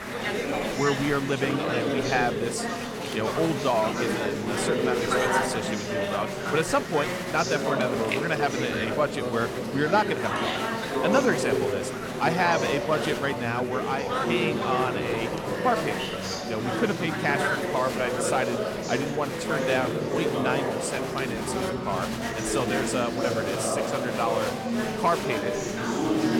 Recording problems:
murmuring crowd; very loud; throughout; as loud as the speech

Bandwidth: 17 kHz